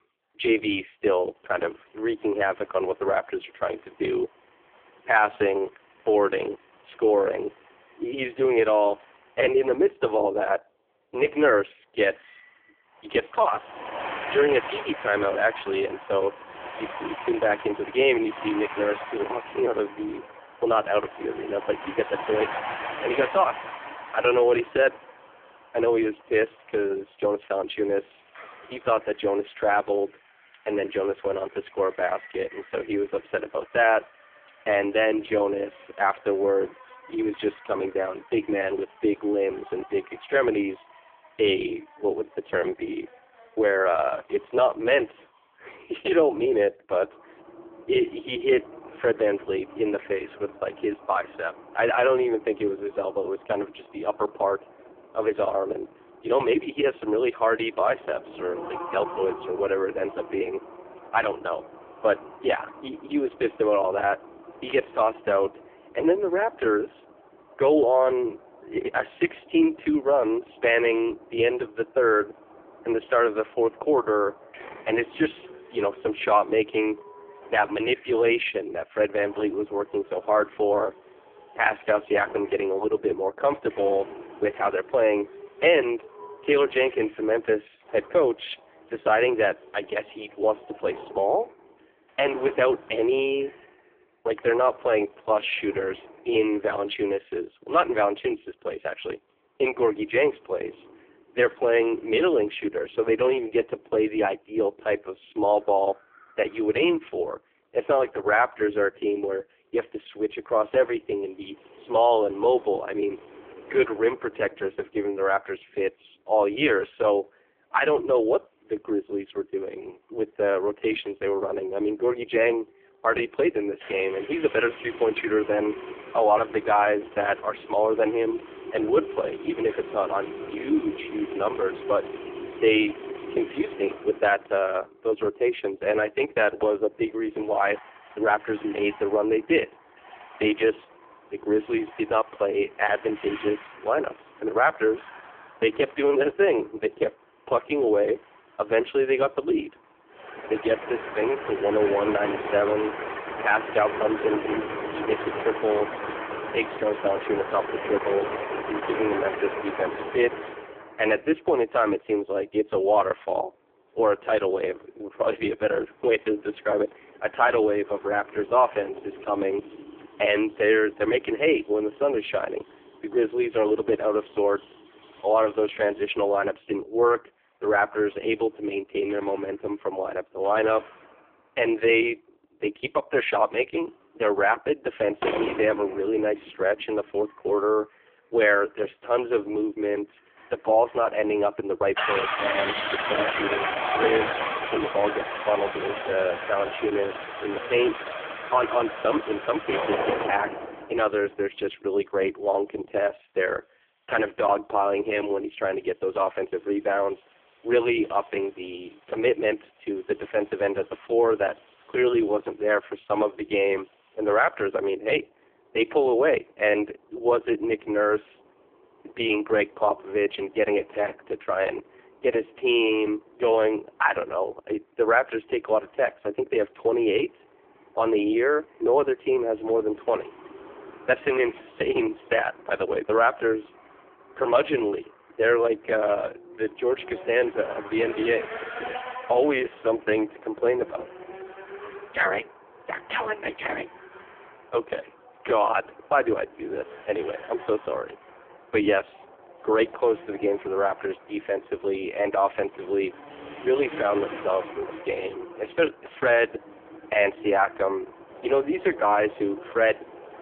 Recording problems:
phone-call audio; poor line
traffic noise; noticeable; throughout; 10 dB below the speech

